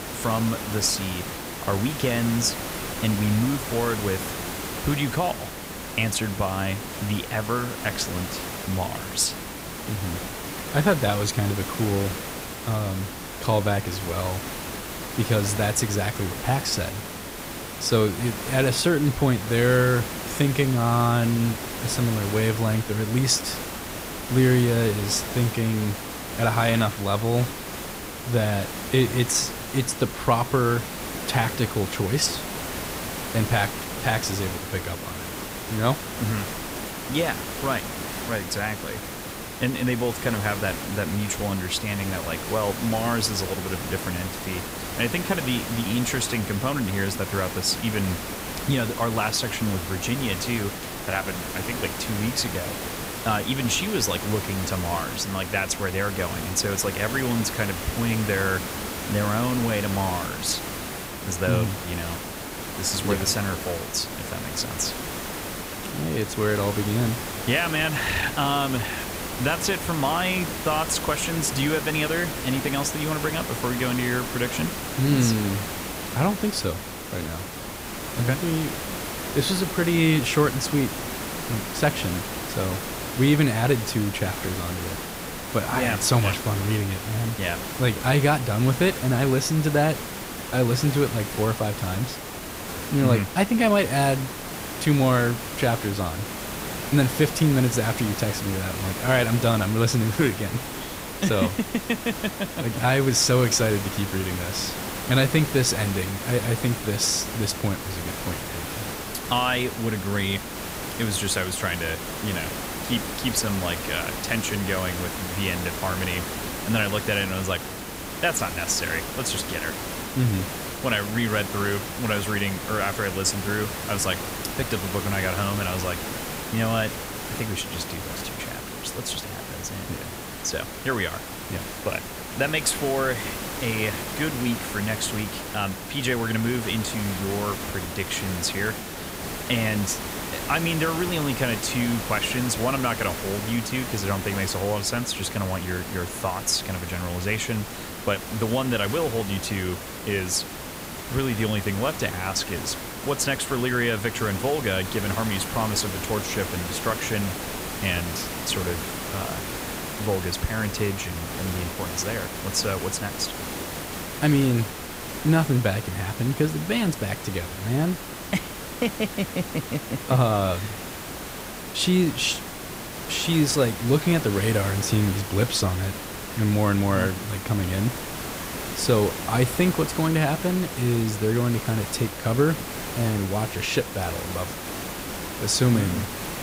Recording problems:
hiss; loud; throughout; 6 dB below the speech

